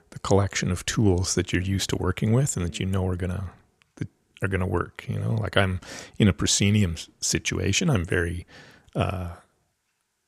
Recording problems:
none

